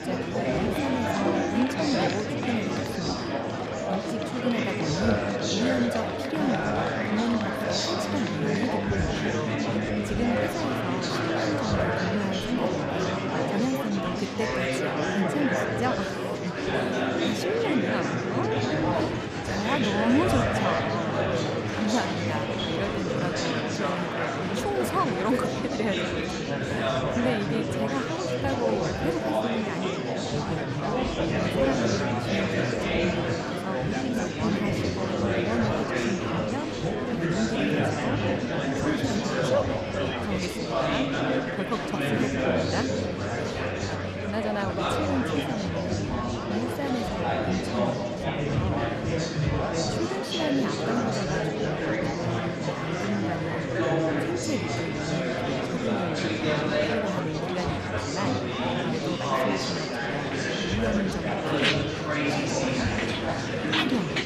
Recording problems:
murmuring crowd; very loud; throughout; 5 dB above the speech

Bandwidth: 14.5 kHz